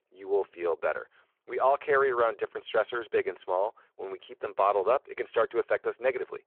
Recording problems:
phone-call audio

